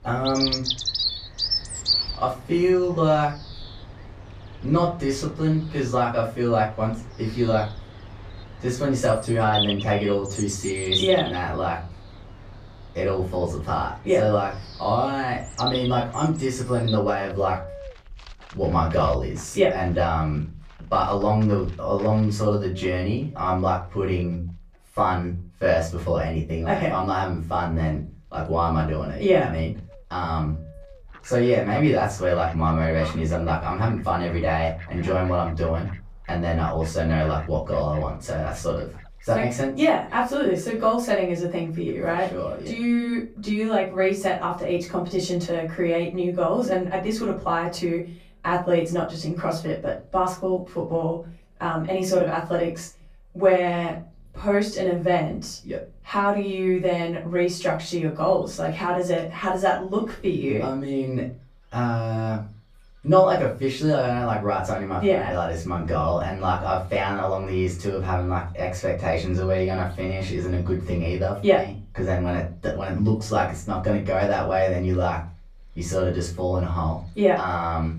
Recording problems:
off-mic speech; far
room echo; slight; dies away in 0.3 s
animal sounds; loud; throughout; 8 dB below the speech

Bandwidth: 15 kHz